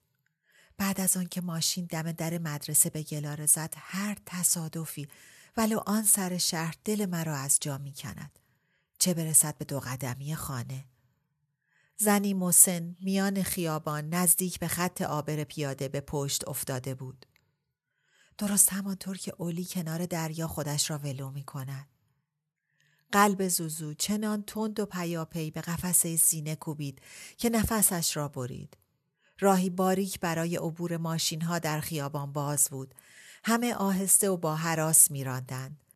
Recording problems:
none

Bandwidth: 13.5 kHz